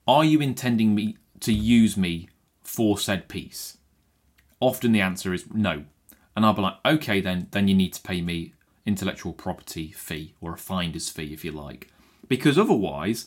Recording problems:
none

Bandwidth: 16 kHz